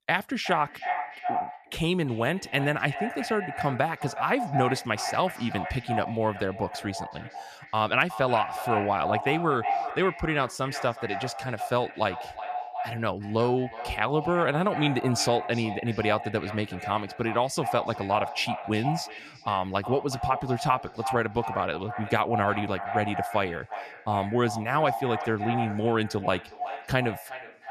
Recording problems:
echo of what is said; strong; throughout; 370 ms later, 7 dB below the speech

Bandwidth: 14.5 kHz